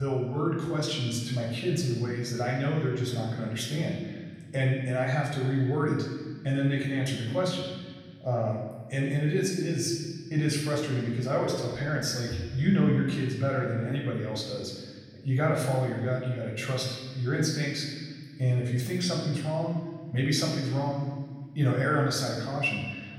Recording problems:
off-mic speech; far
room echo; noticeable; dies away in 1.5 s
abrupt cut into speech; at the start

